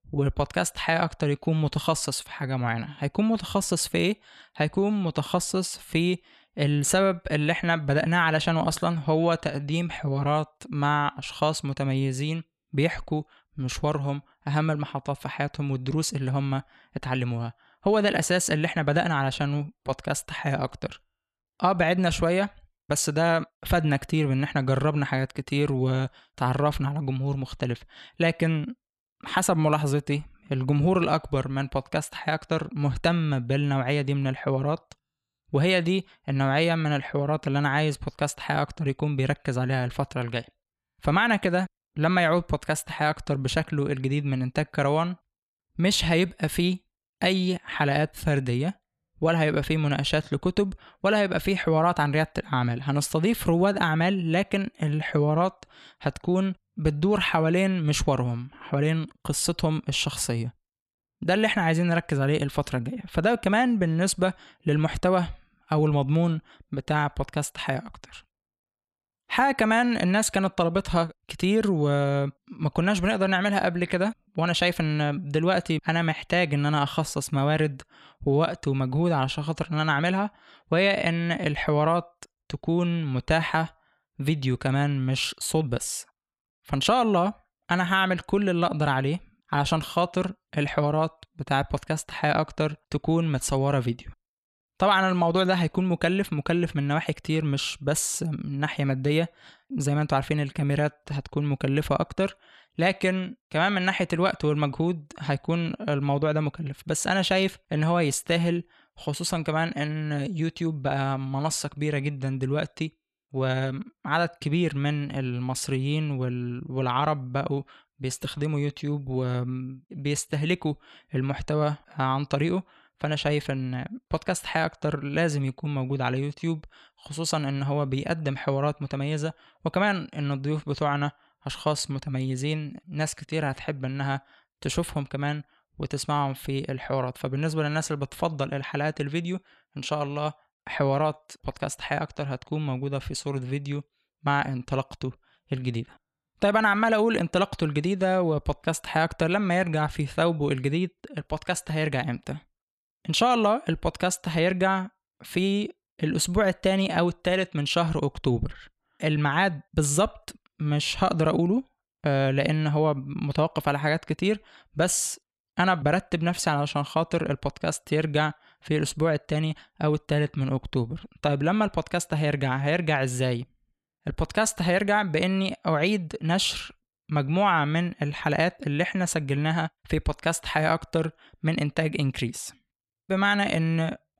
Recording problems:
none

